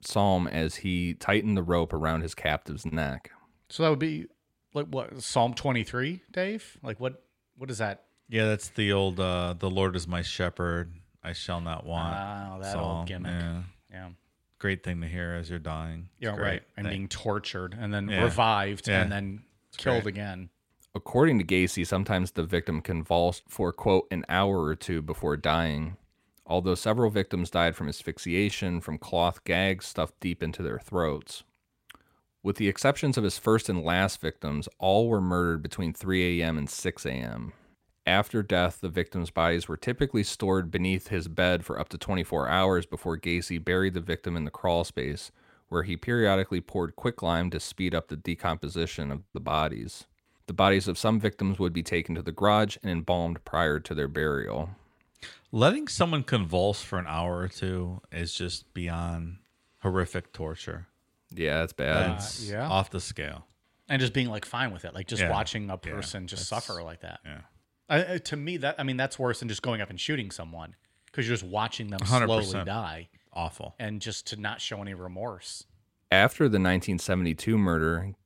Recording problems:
none

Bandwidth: 16 kHz